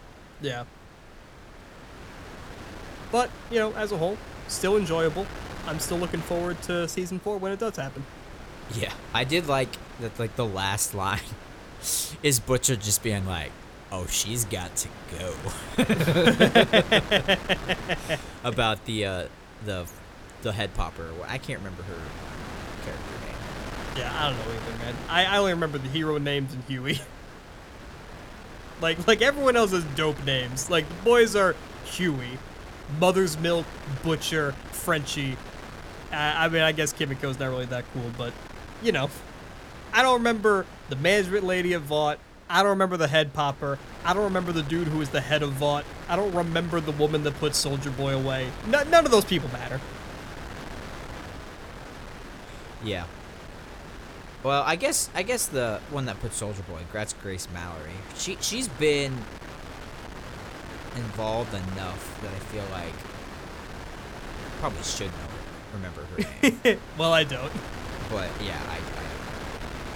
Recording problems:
wind noise on the microphone; occasional gusts; 15 dB below the speech

